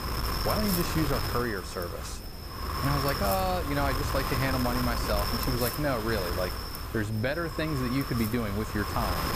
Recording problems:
wind noise on the microphone; heavy; 1 dB below the speech

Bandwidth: 15 kHz